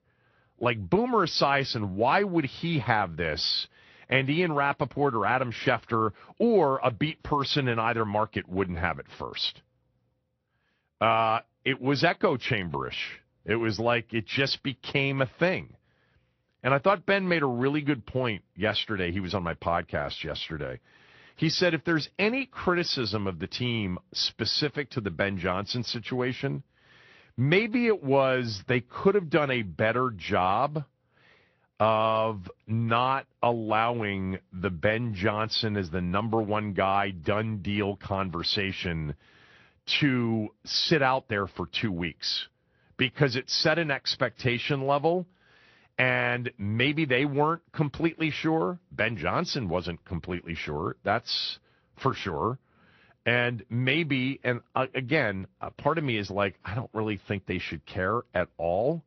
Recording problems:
high frequencies cut off; noticeable; nothing above 5.5 kHz
garbled, watery; slightly

